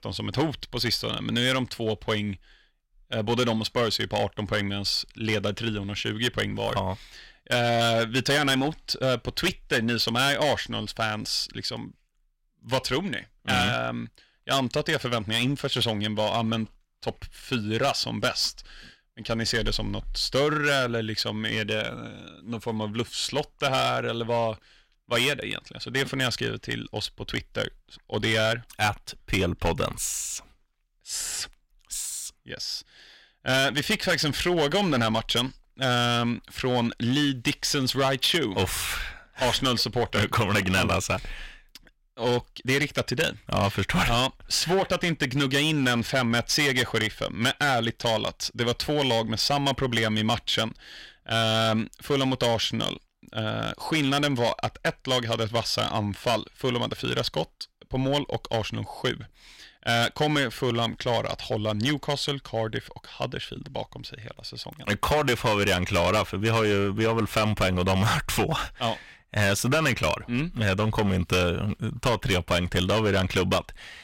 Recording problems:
distortion; heavy; 7% of the sound clipped

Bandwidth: 16 kHz